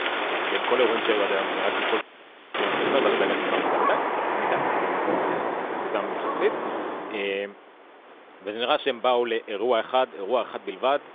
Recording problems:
phone-call audio; nothing above 3.5 kHz
rain or running water; very loud; until 7 s; 1 dB above the speech
wind noise on the microphone; occasional gusts; 15 dB below the speech
audio freezing; at 2 s for 0.5 s

